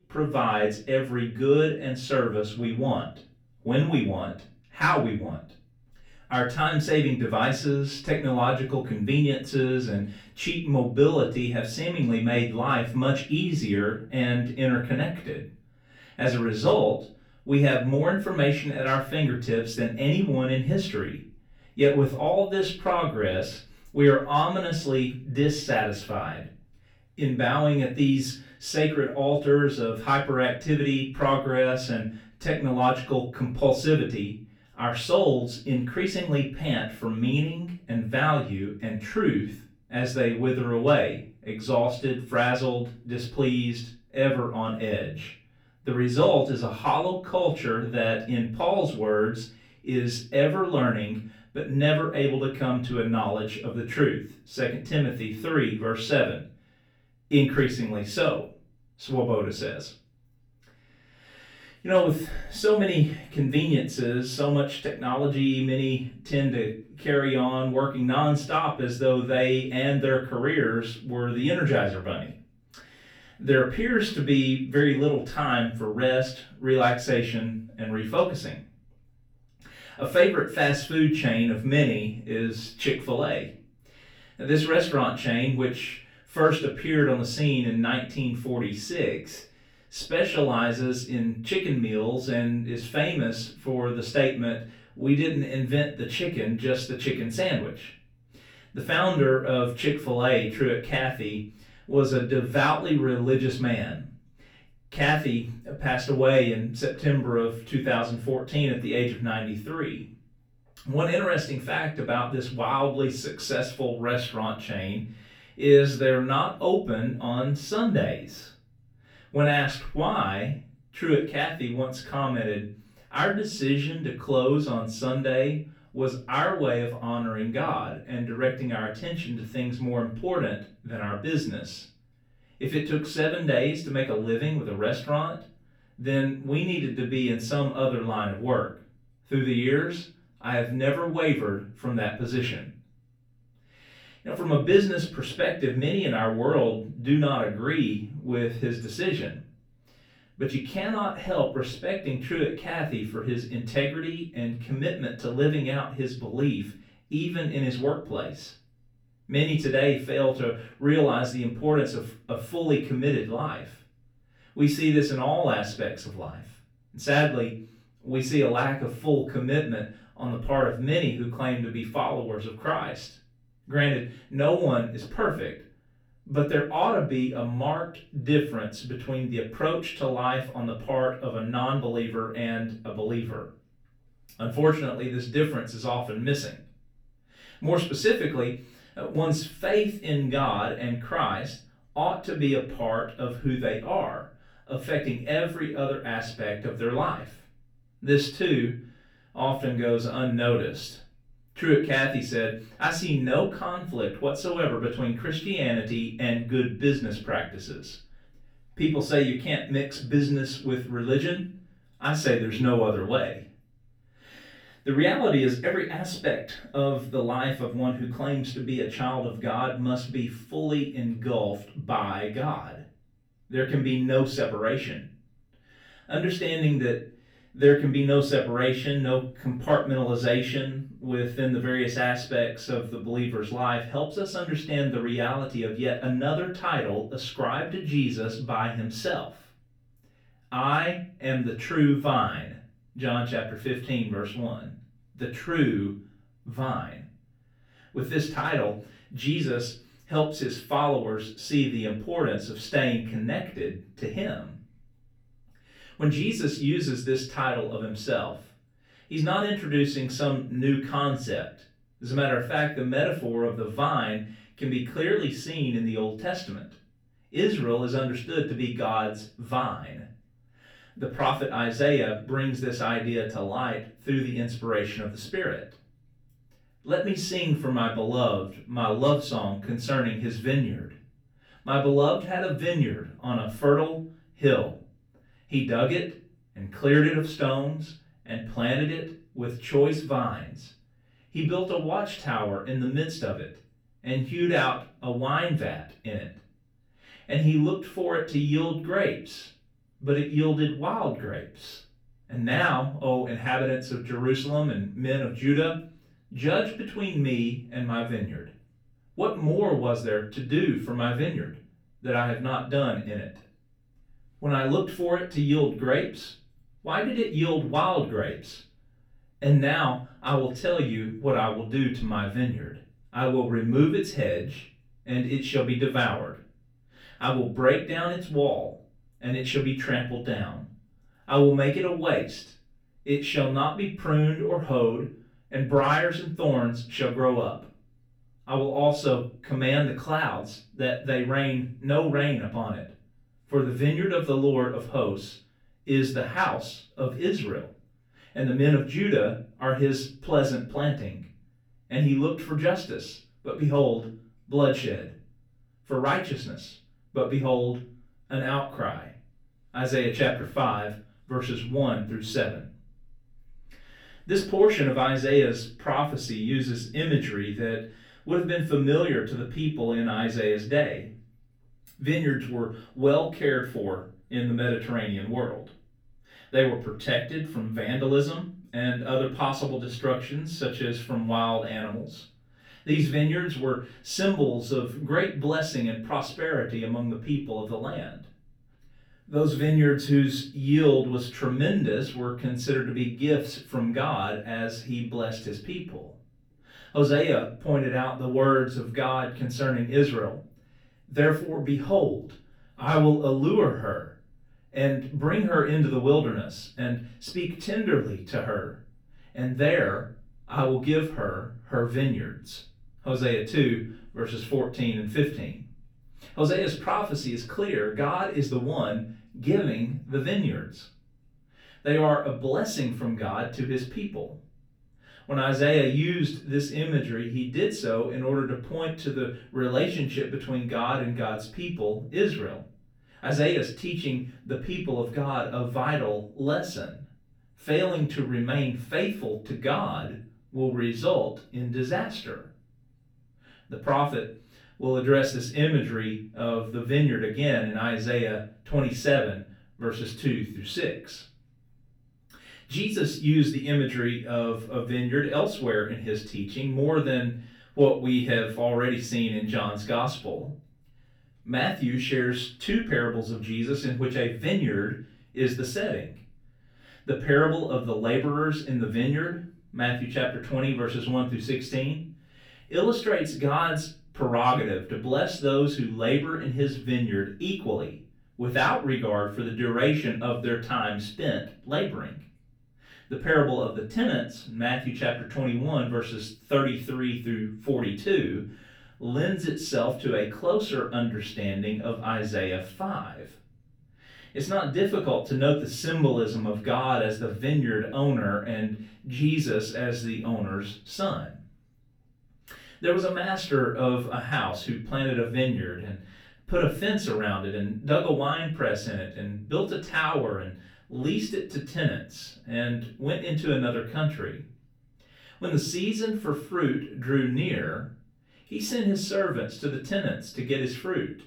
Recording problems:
off-mic speech; far
room echo; slight; dies away in 0.4 s

